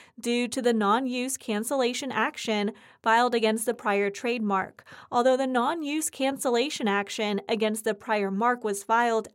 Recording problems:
none

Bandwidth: 16 kHz